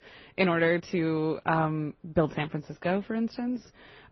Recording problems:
garbled, watery; slightly; nothing above 6 kHz

